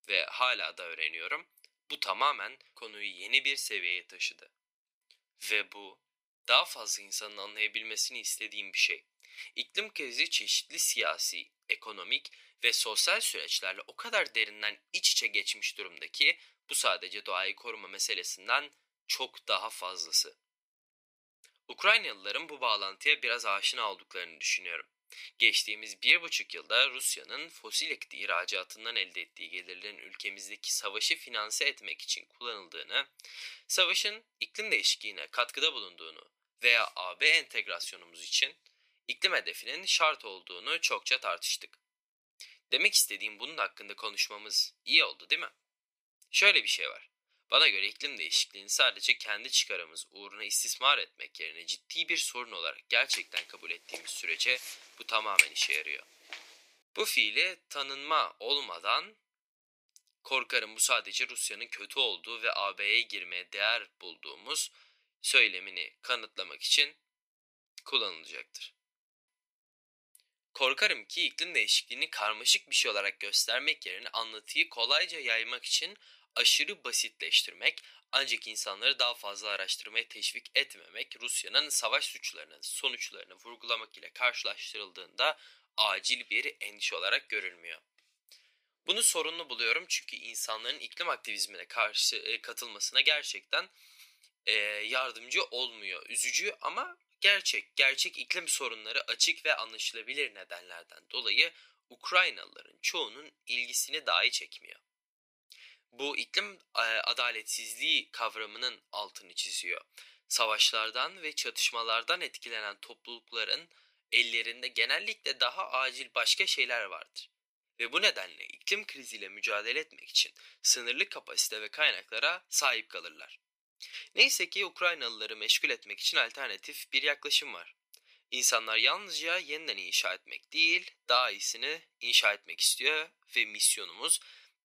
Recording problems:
thin; very; fading below 450 Hz
footsteps; loud; from 53 to 55 s; peak 5 dB above the speech

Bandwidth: 15 kHz